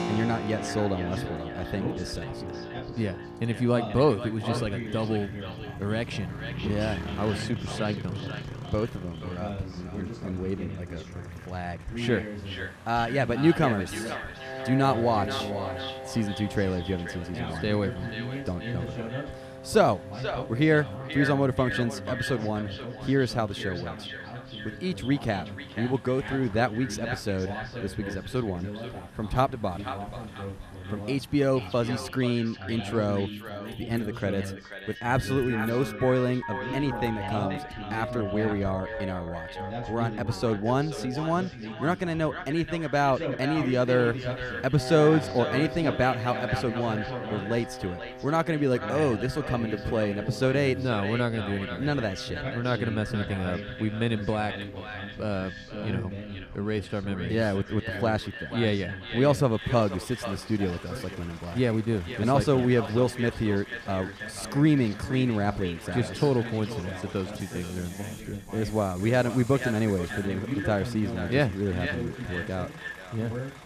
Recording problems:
echo of what is said; strong; throughout; 480 ms later, 10 dB below the speech
background music; noticeable; throughout; 15 dB below the speech
traffic noise; noticeable; throughout; 20 dB below the speech
voice in the background; noticeable; throughout; 10 dB below the speech

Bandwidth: 14.5 kHz